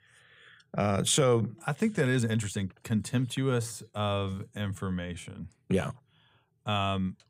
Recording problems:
uneven, jittery; strongly; from 0.5 to 5.5 s

